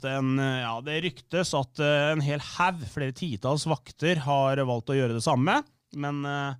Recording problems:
none

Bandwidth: 15 kHz